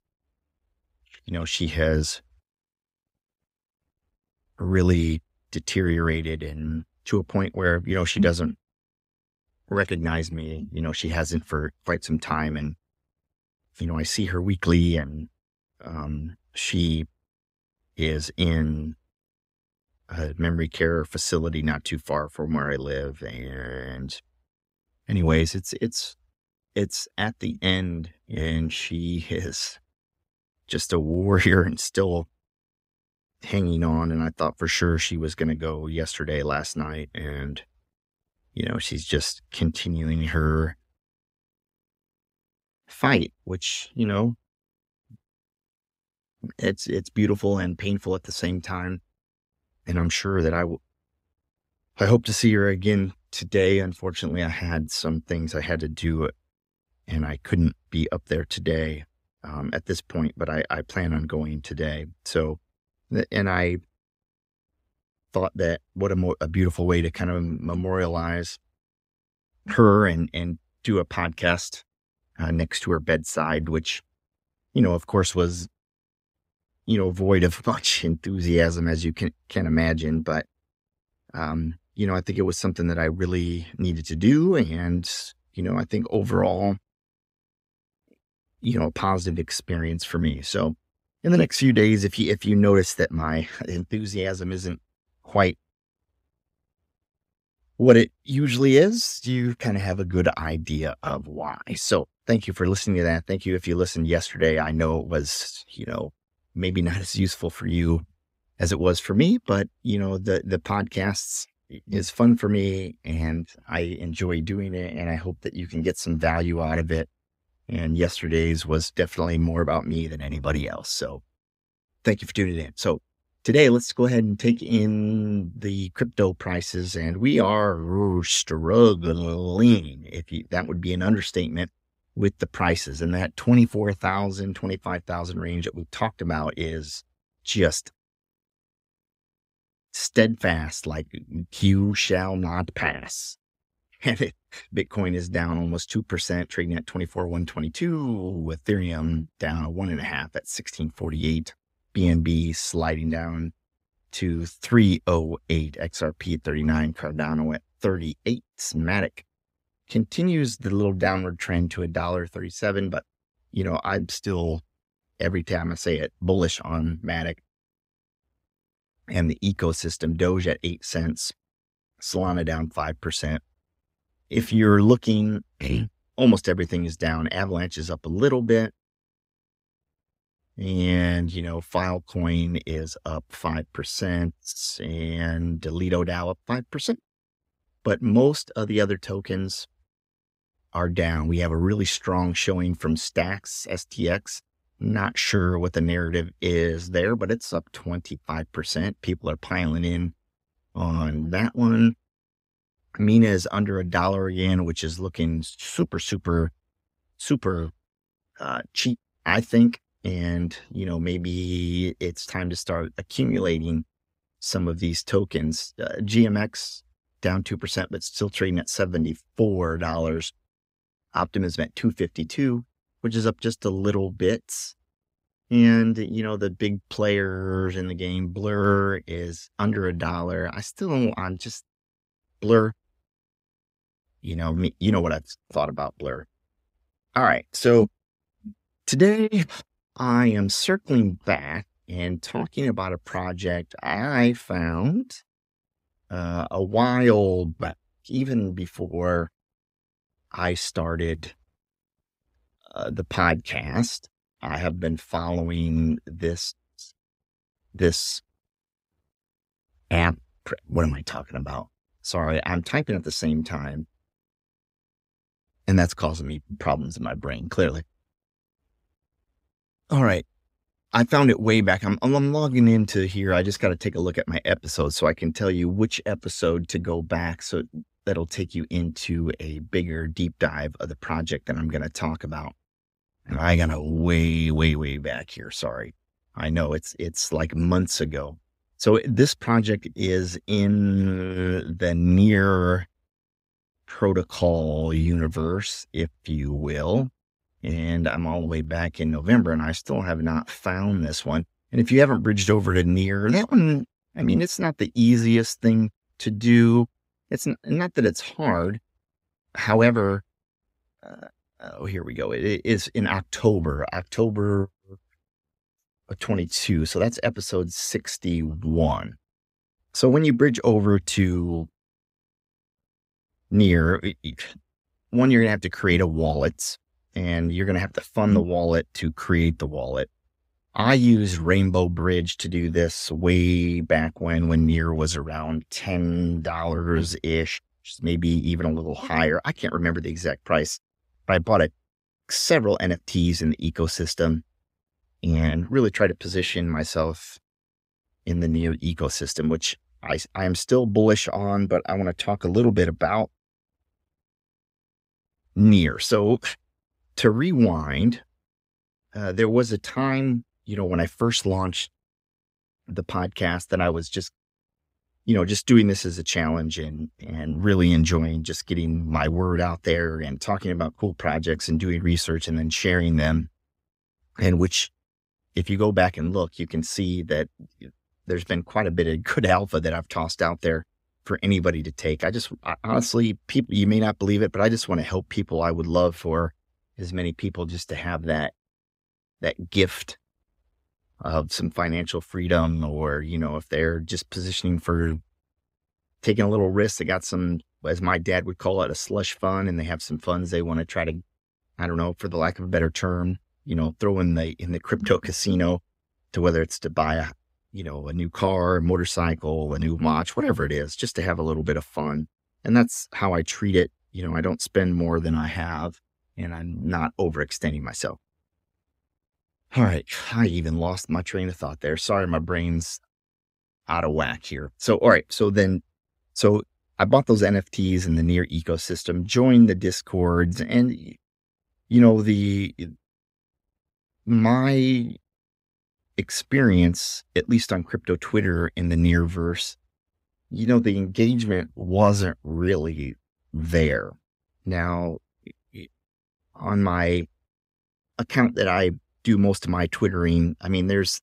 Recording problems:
none

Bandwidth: 15.5 kHz